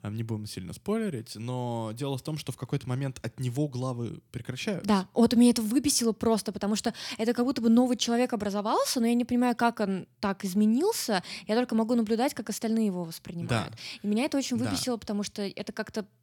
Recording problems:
none

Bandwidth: 18 kHz